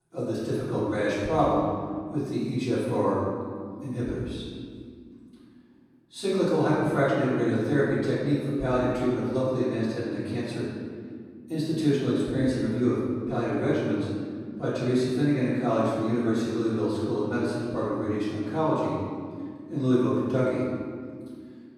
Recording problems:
room echo; strong; dies away in 2.1 s
off-mic speech; far

